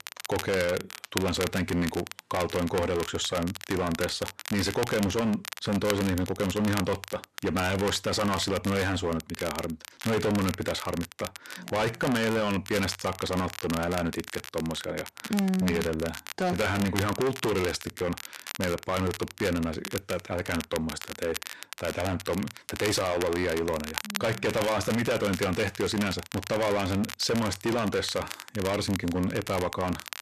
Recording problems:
distortion; heavy; 14% of the sound clipped
crackle, like an old record; loud; 10 dB below the speech

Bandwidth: 14 kHz